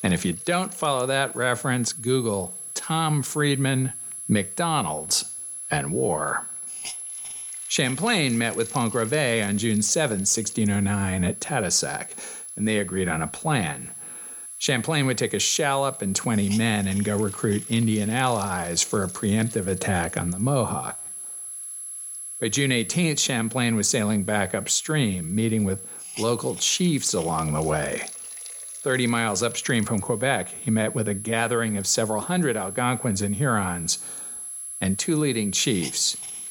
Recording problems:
high-pitched whine; loud; throughout; 11 kHz, 9 dB below the speech
hiss; faint; throughout; 20 dB below the speech

